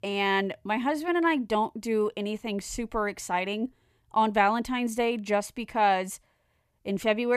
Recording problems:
abrupt cut into speech; at the end

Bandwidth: 14.5 kHz